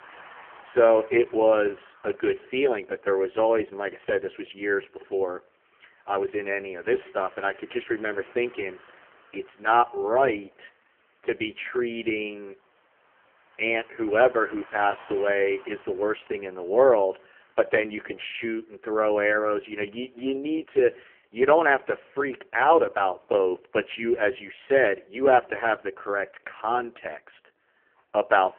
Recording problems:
phone-call audio; poor line; nothing above 3 kHz
traffic noise; faint; throughout; 25 dB below the speech

